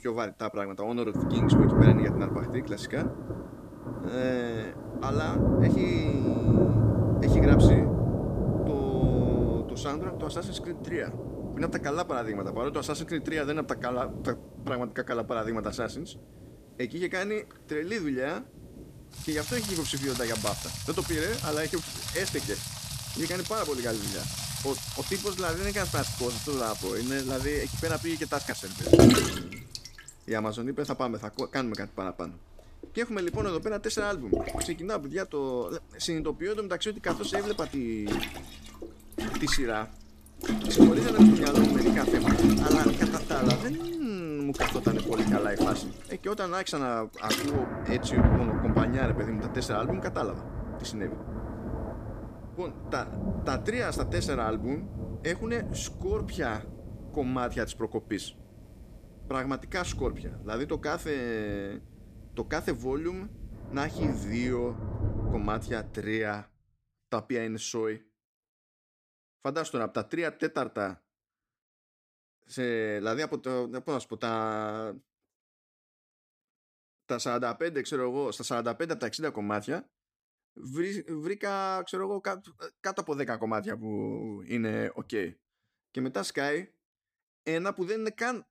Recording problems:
rain or running water; very loud; until 1:06; 5 dB above the speech

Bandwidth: 14.5 kHz